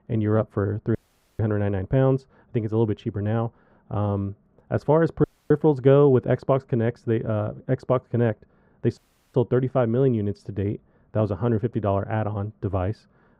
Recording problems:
muffled; very; fading above 2.5 kHz
audio cutting out; at 1 s, at 5 s and at 9 s

